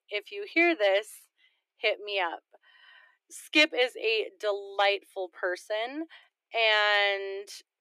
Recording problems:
thin; very; fading below 300 Hz

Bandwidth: 14.5 kHz